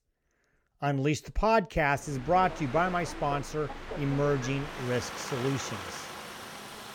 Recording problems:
train or aircraft noise; noticeable; from 2 s on; 10 dB below the speech

